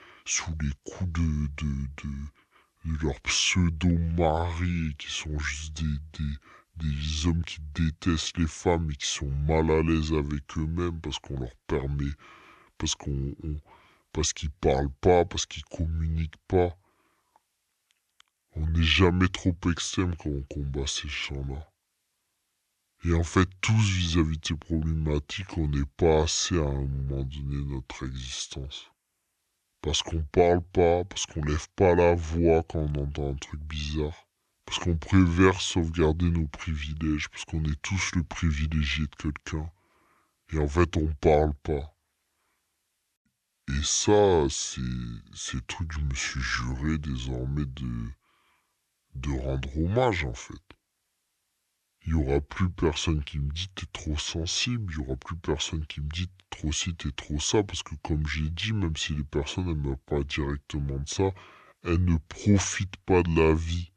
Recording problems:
wrong speed and pitch; too slow and too low; 0.7 times normal speed

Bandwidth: 13 kHz